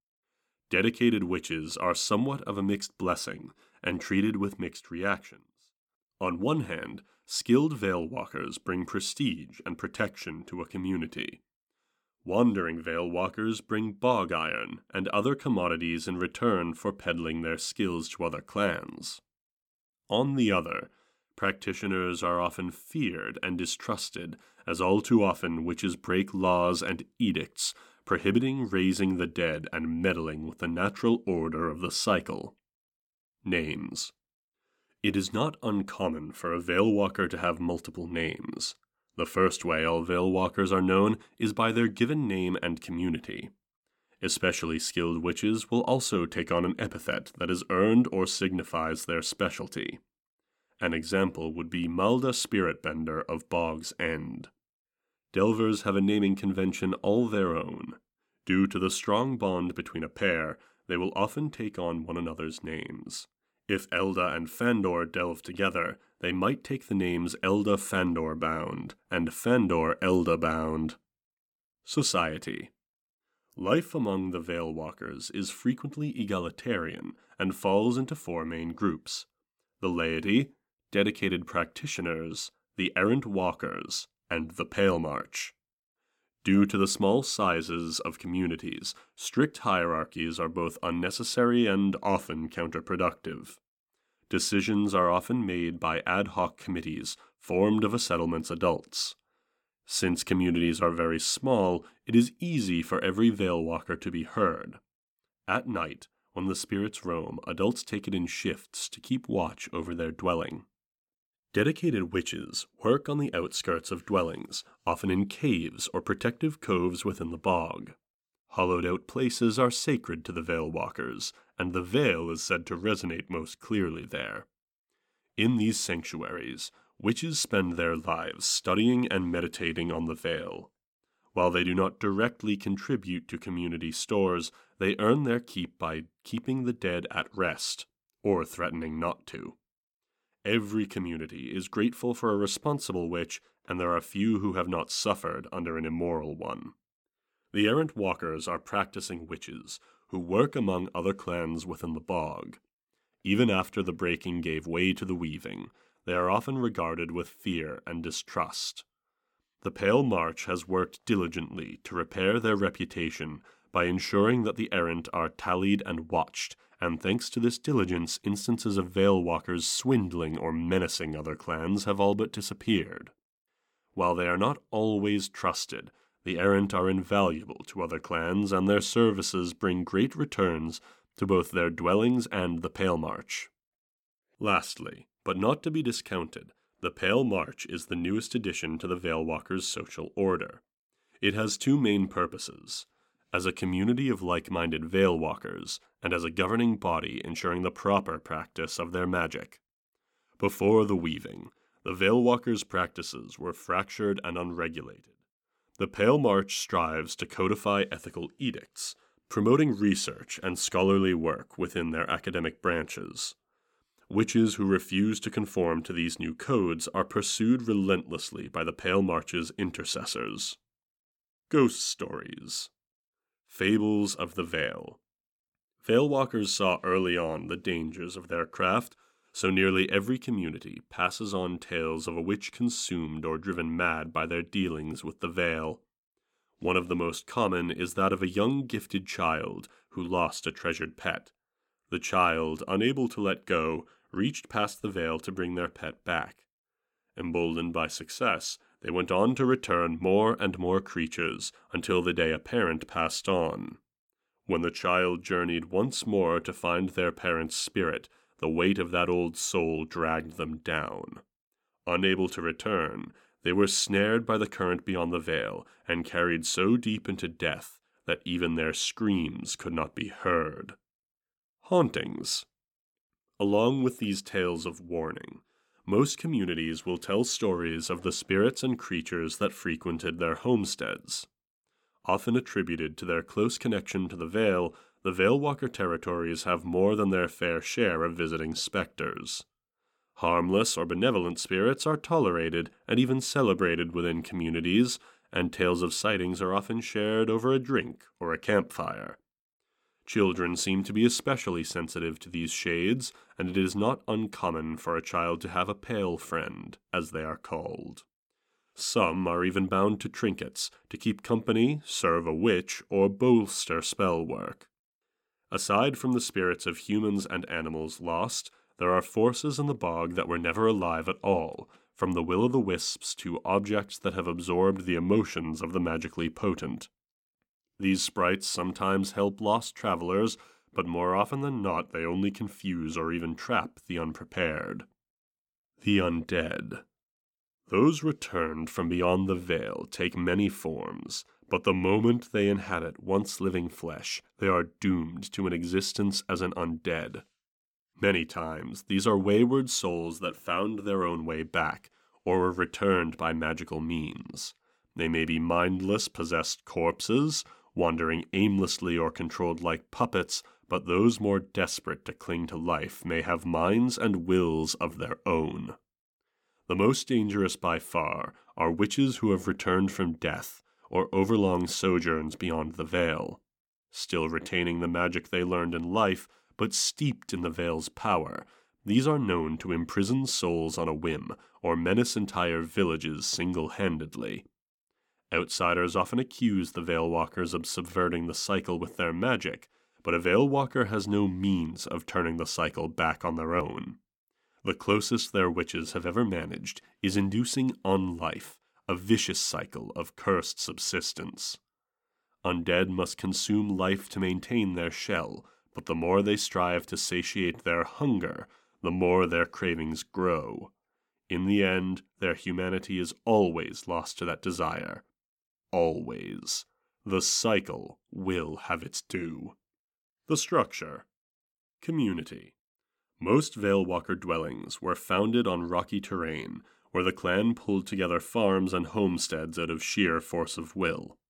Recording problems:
none

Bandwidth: 17.5 kHz